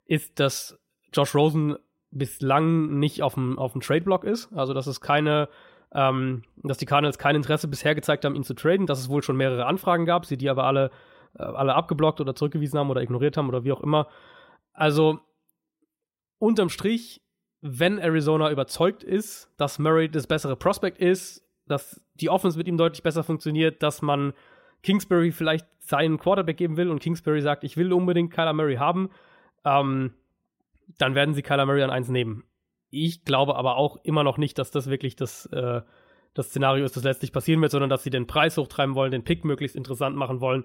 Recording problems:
none

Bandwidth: 16 kHz